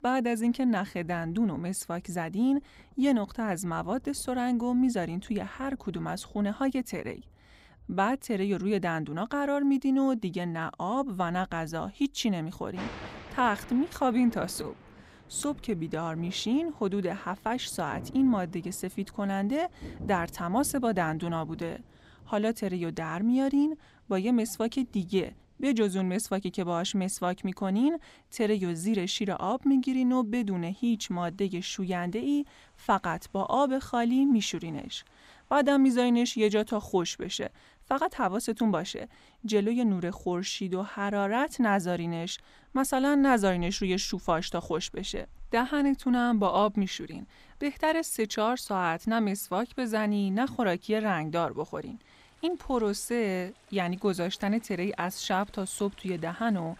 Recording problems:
rain or running water; faint; throughout; 25 dB below the speech

